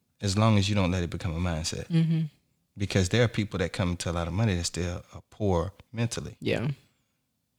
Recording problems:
none

